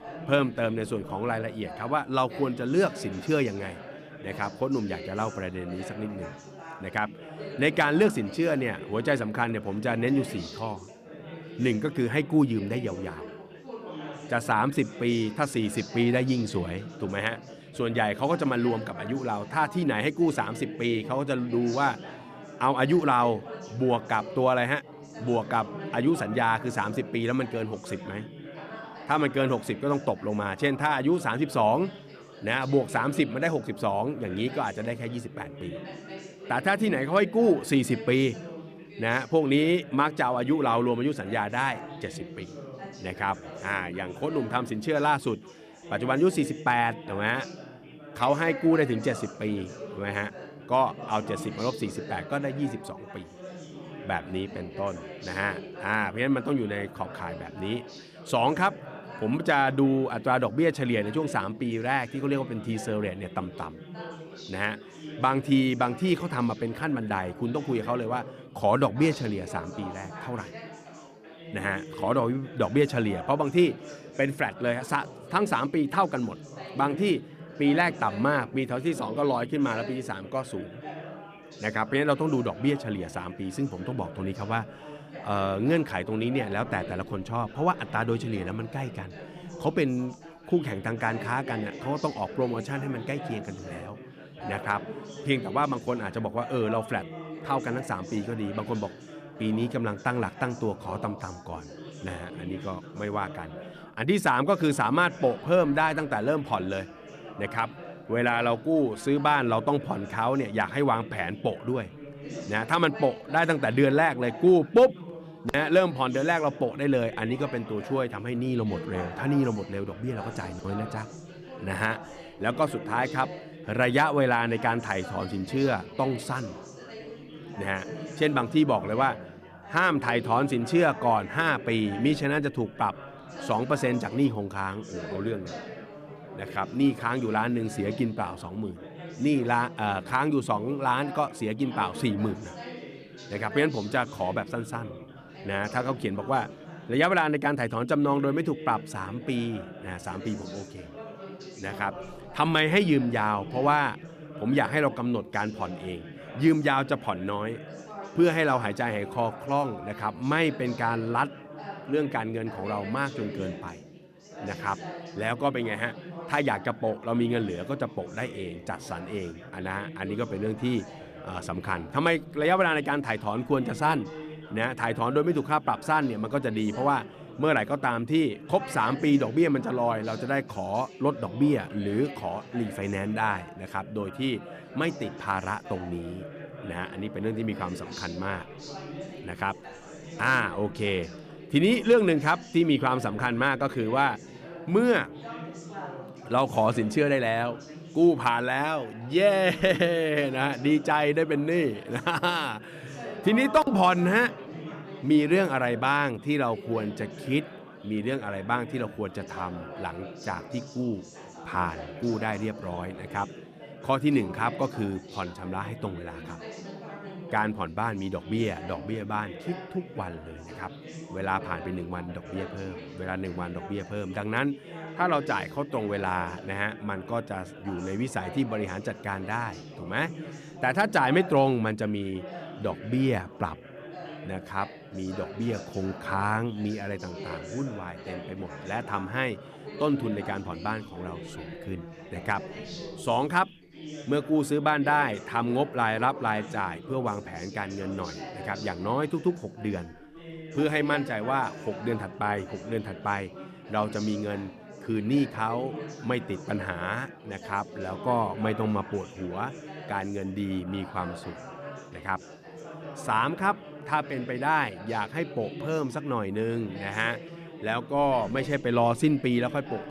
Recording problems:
background chatter; noticeable; throughout; 4 voices, 15 dB below the speech

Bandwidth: 14.5 kHz